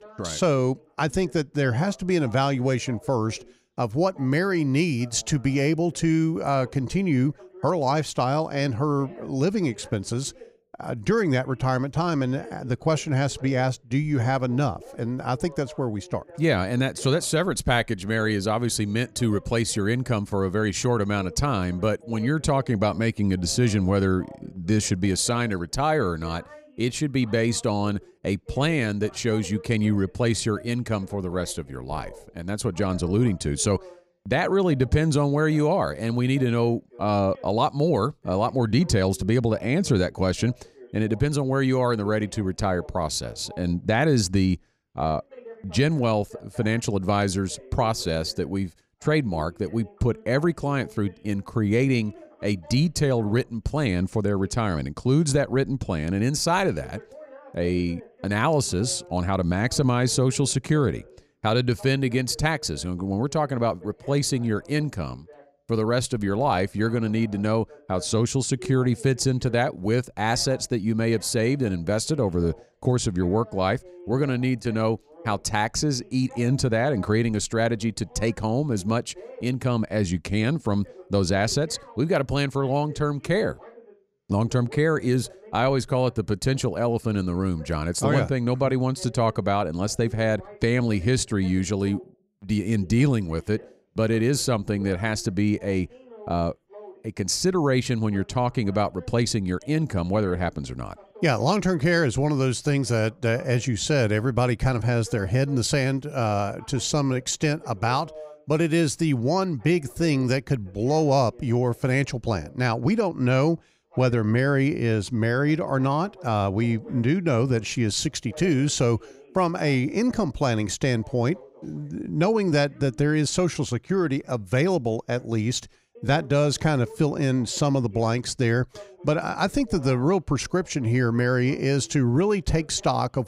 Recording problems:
voice in the background; faint; throughout; 25 dB below the speech

